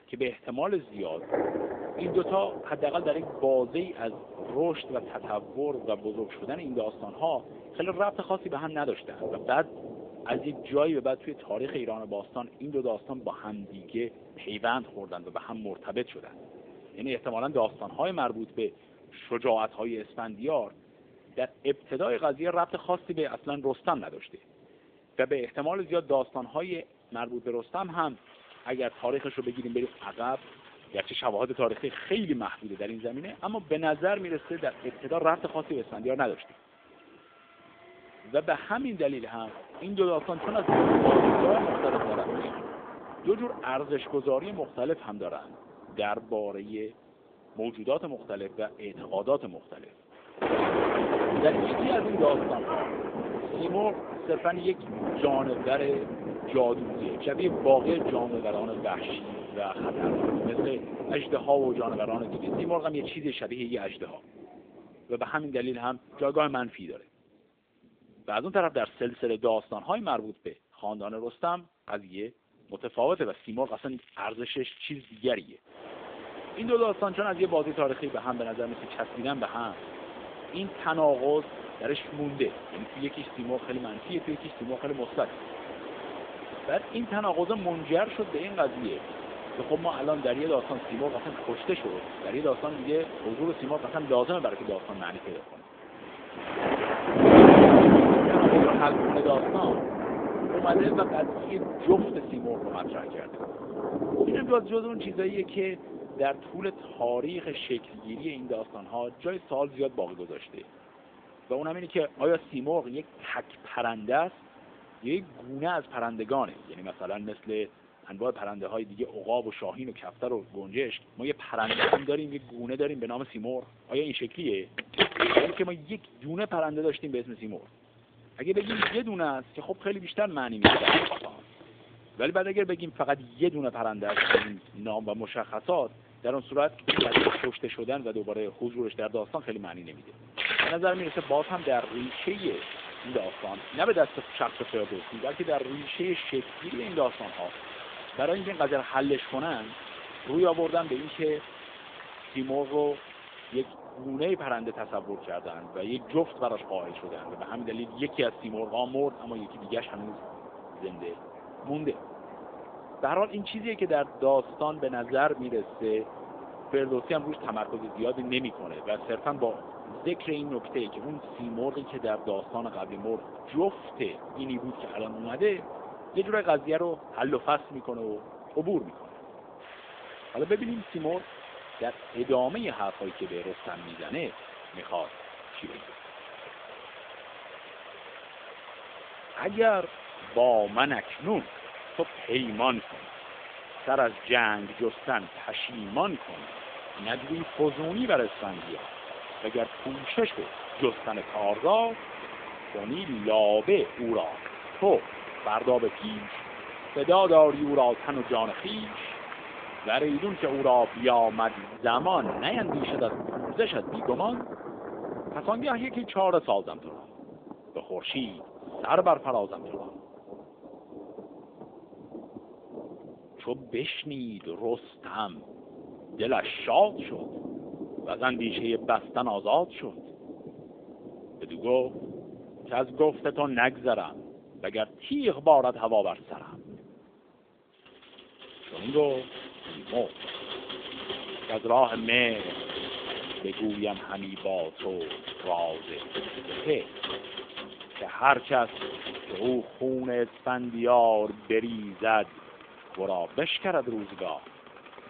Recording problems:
phone-call audio; nothing above 3.5 kHz
rain or running water; loud; throughout; 1 dB below the speech
crackling; faint; from 1:13 to 1:15 and at 1:24; 25 dB below the speech

